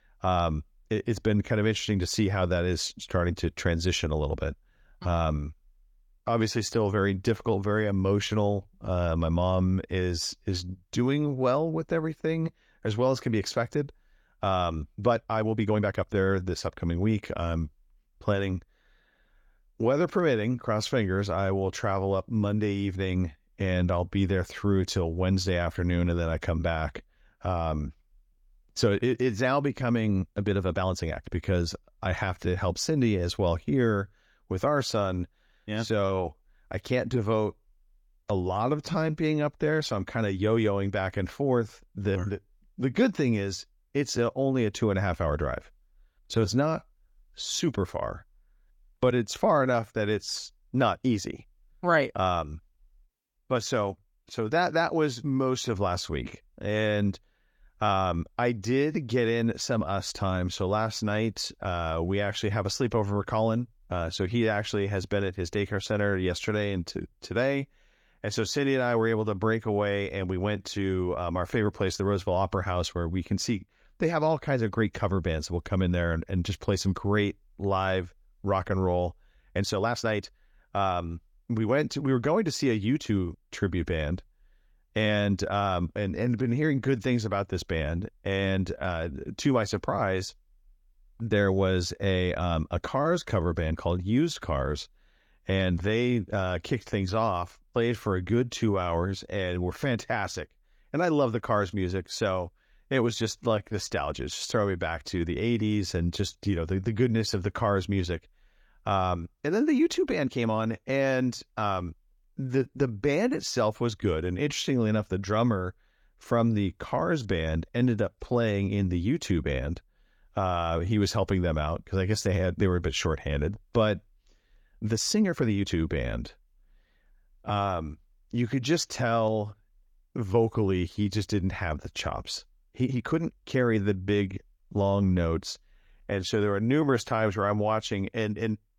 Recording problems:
uneven, jittery; strongly; from 15 s to 2:15

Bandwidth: 18 kHz